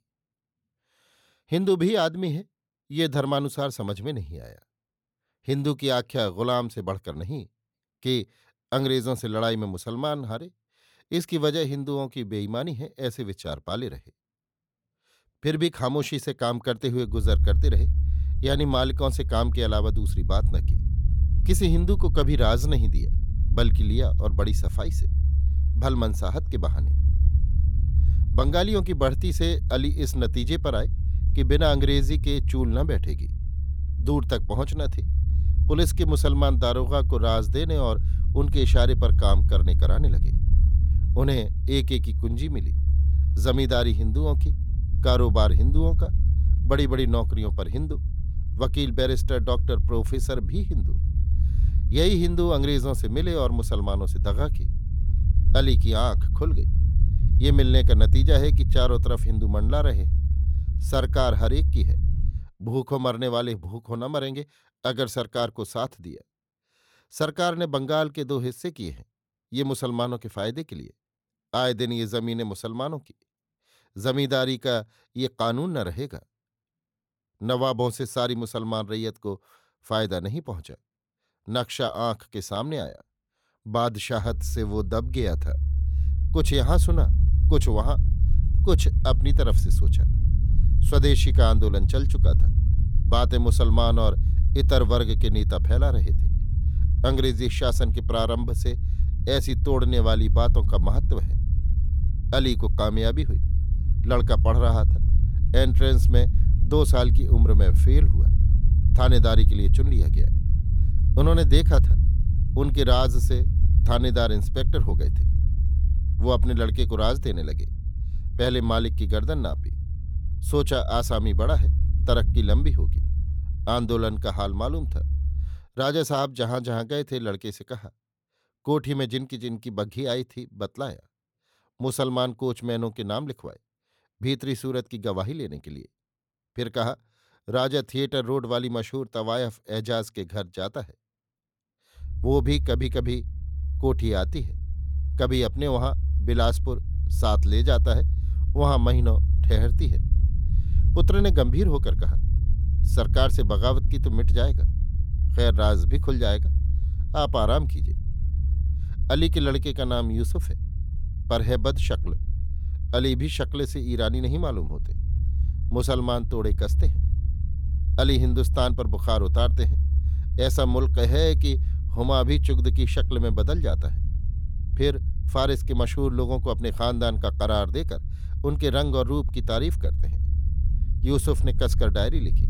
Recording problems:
low rumble; noticeable; from 17 s to 1:02, from 1:24 to 2:06 and from 2:22 on; 15 dB below the speech

